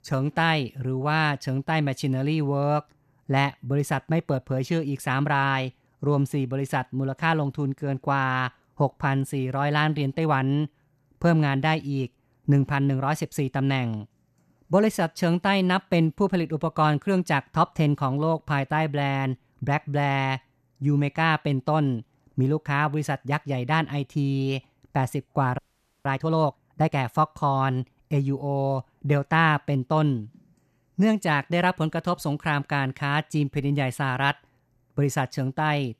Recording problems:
audio freezing; at 26 s

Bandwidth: 14 kHz